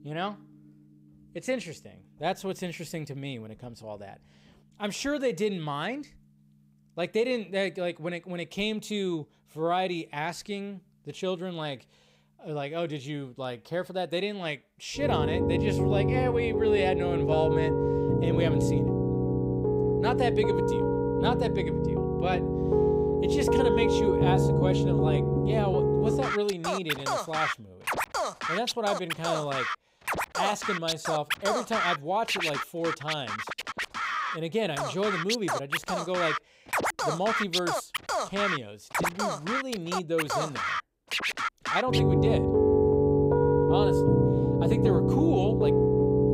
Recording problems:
background music; very loud; throughout; 5 dB above the speech

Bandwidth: 15.5 kHz